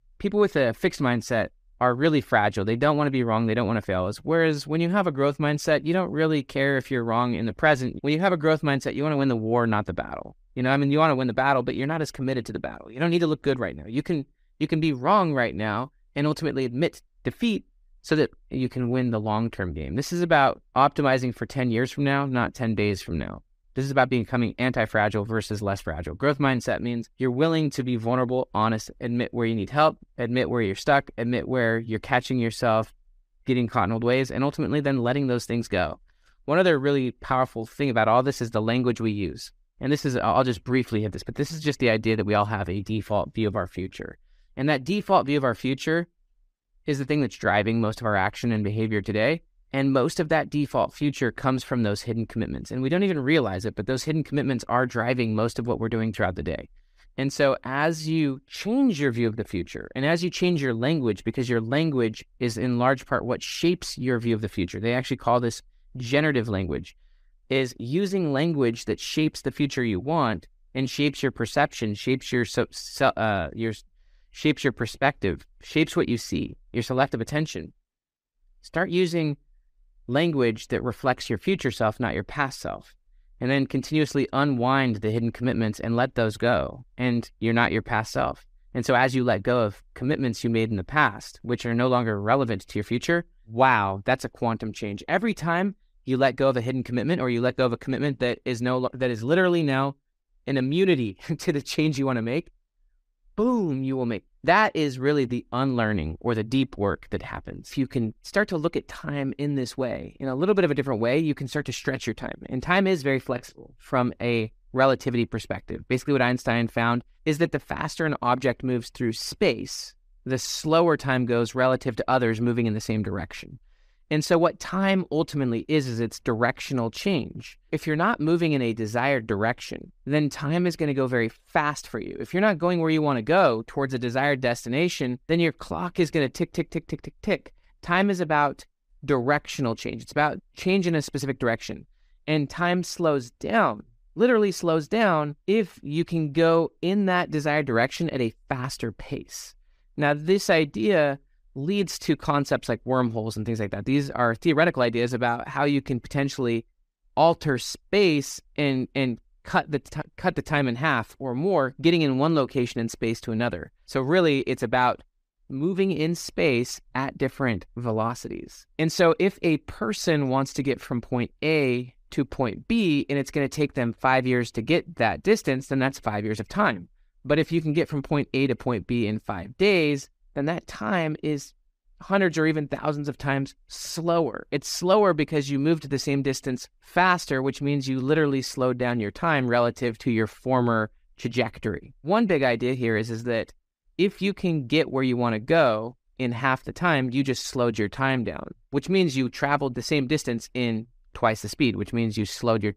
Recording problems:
none

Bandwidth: 15 kHz